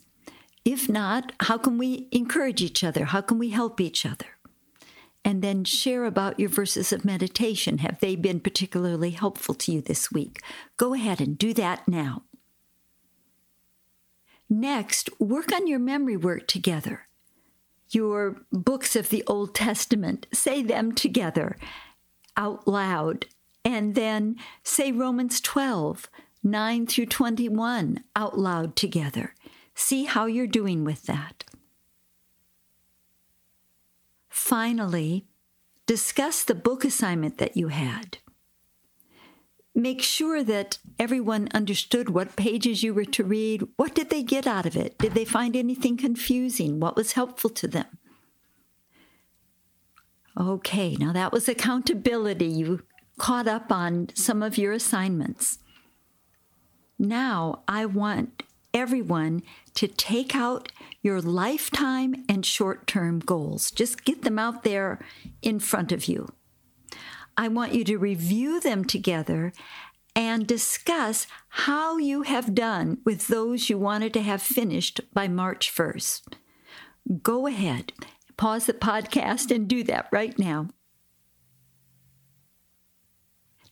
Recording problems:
squashed, flat; somewhat

